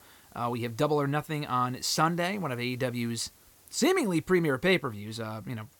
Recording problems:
hiss; faint; throughout; 30 dB below the speech

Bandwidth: 17 kHz